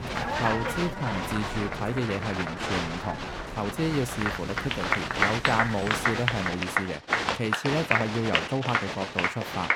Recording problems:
crowd noise; very loud; throughout; 2 dB above the speech
rain or running water; loud; until 6.5 s; 7 dB below the speech
uneven, jittery; strongly; from 1 to 9 s

